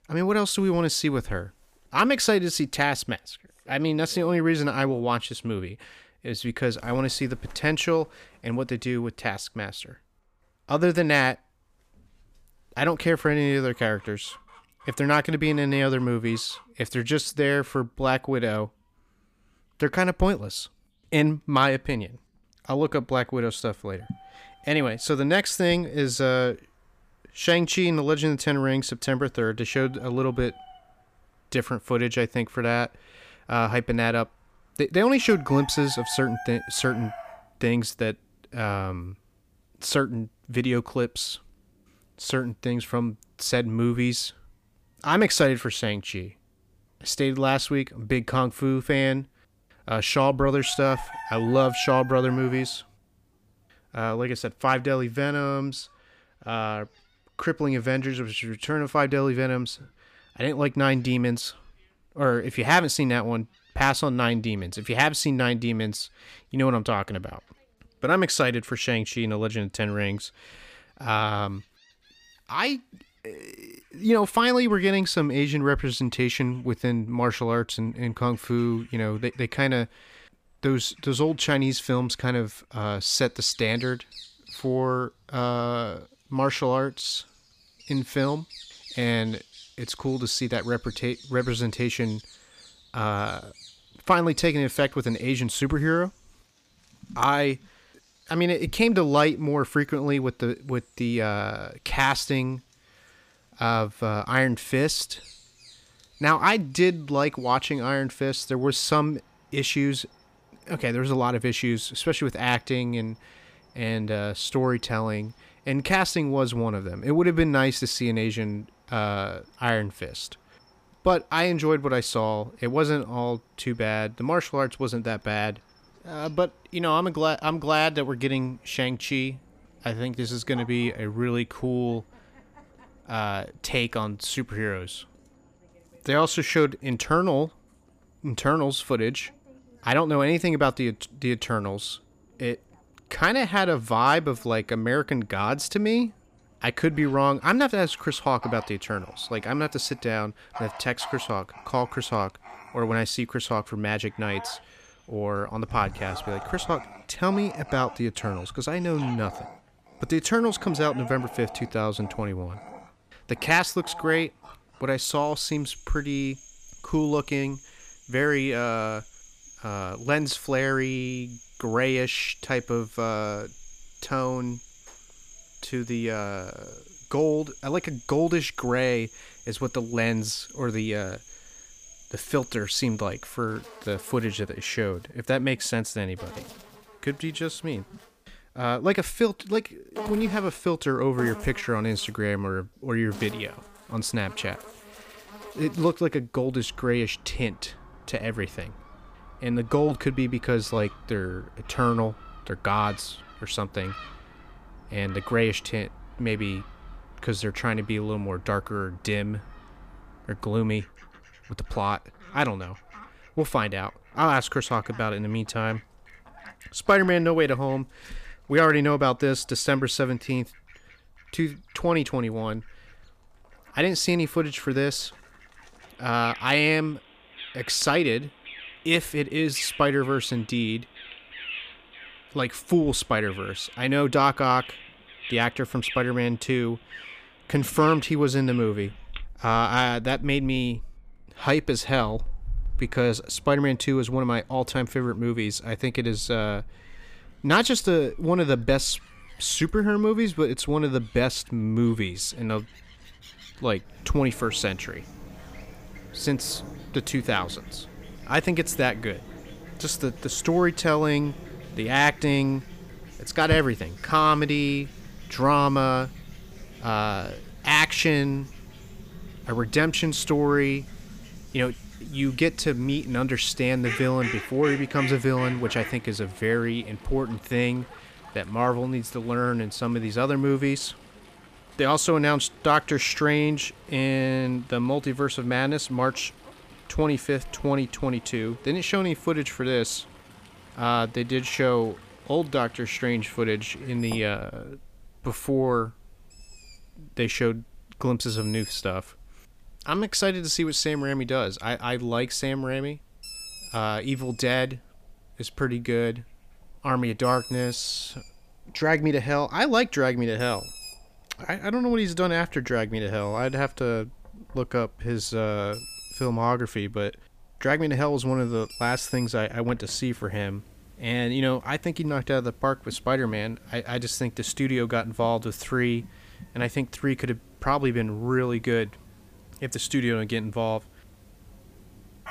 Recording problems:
animal sounds; noticeable; throughout; 20 dB below the speech

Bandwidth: 15 kHz